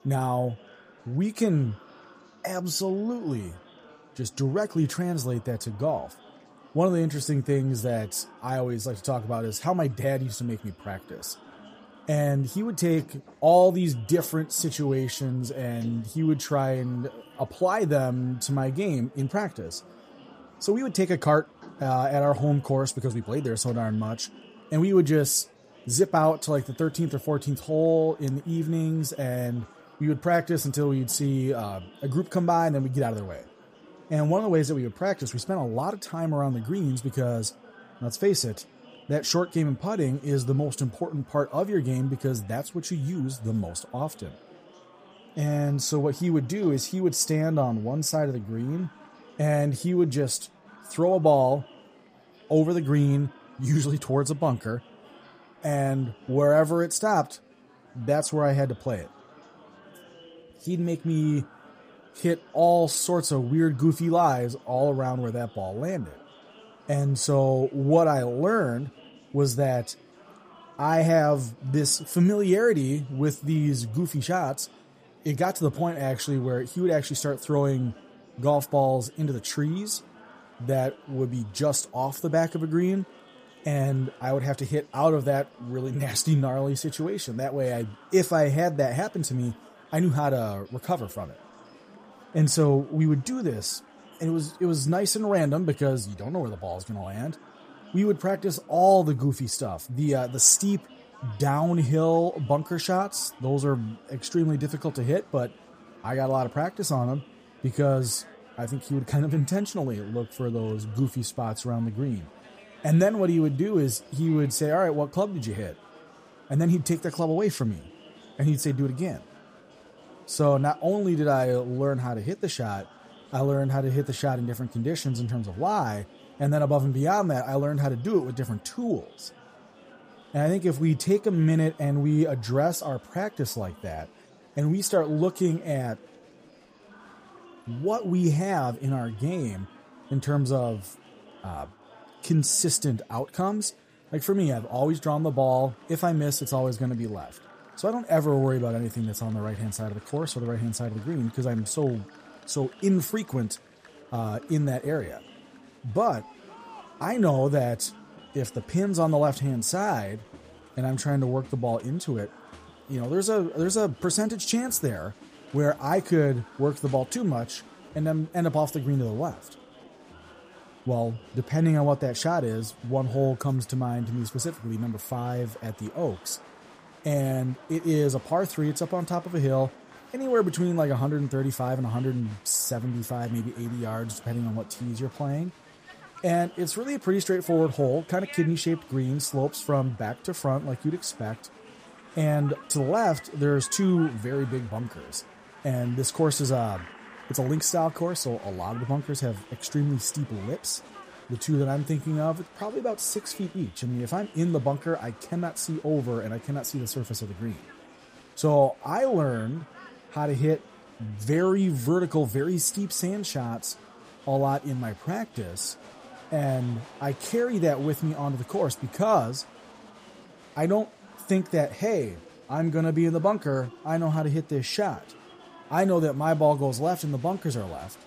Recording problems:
murmuring crowd; faint; throughout; 25 dB below the speech

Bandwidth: 15 kHz